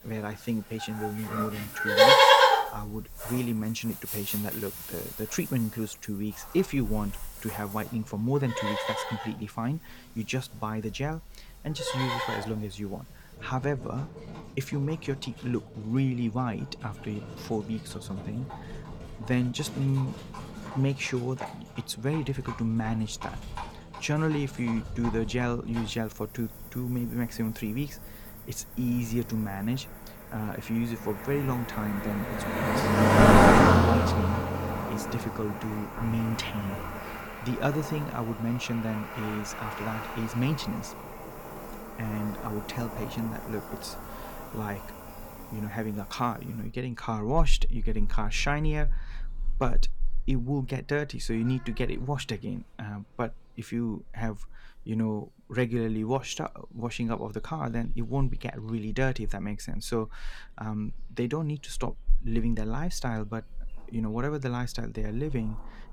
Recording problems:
animal sounds; very loud; throughout; 4 dB above the speech

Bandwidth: 18 kHz